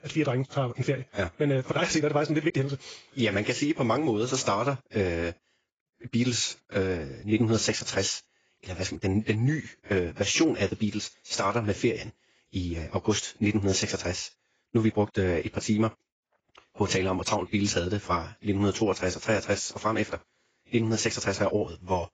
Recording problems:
garbled, watery; badly; nothing above 7.5 kHz
wrong speed, natural pitch; too fast; 1.5 times normal speed

